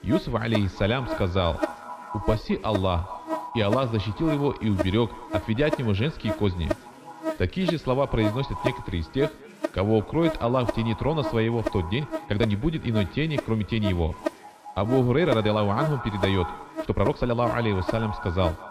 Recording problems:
echo of what is said; noticeable; throughout; 210 ms later, 15 dB below the speech
muffled; slightly; fading above 3.5 kHz
electrical hum; loud; throughout; 60 Hz, 6 dB below the speech
background chatter; faint; throughout; 4 voices, 25 dB below the speech
uneven, jittery; strongly; from 1 to 17 s

